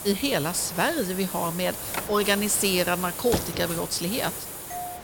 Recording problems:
hiss; loud; throughout; 7 dB below the speech
phone ringing; noticeable; at 1.5 s; peak 10 dB below the speech
door banging; noticeable; at 3.5 s; peak 5 dB below the speech
doorbell; faint; at 4.5 s; peak 10 dB below the speech

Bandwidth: 18 kHz